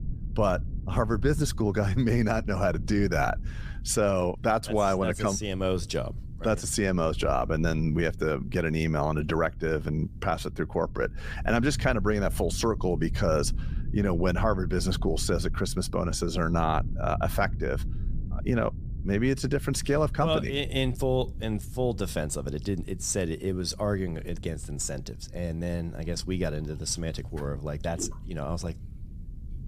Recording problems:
low rumble; faint; throughout; 20 dB below the speech

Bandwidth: 15 kHz